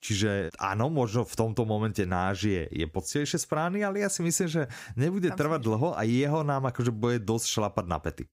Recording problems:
none

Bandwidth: 15.5 kHz